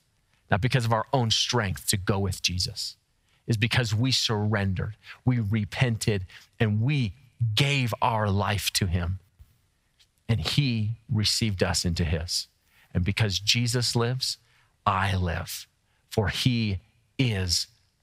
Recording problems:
squashed, flat; heavily

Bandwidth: 15.5 kHz